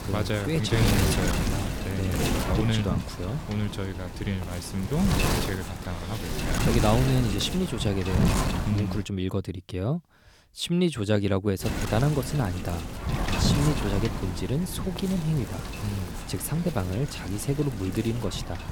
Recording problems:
wind noise on the microphone; heavy; until 9 s and from 12 s on; 1 dB below the speech

